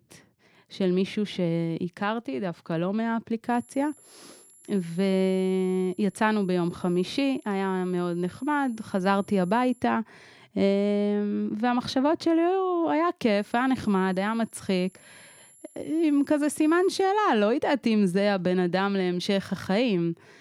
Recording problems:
high-pitched whine; faint; from 3.5 to 10 s and from 13 to 17 s; 11 kHz, 30 dB below the speech

